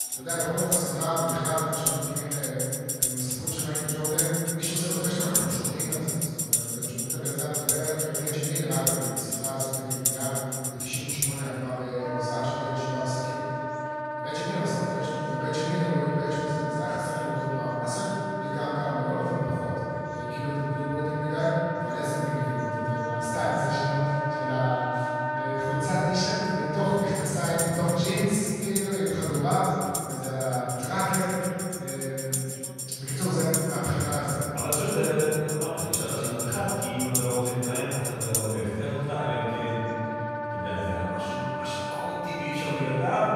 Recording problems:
room echo; strong; dies away in 2.7 s
off-mic speech; far
background music; loud; throughout; 1 dB below the speech
chatter from many people; faint; throughout; 25 dB below the speech

